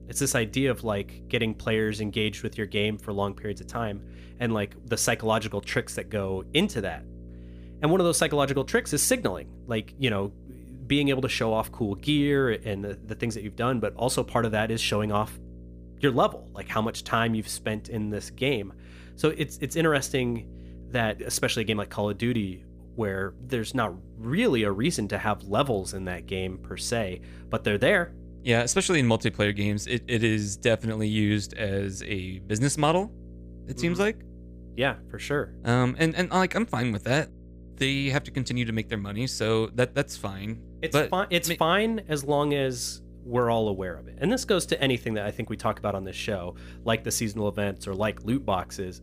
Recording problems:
electrical hum; faint; throughout; 60 Hz, 25 dB below the speech

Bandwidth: 15 kHz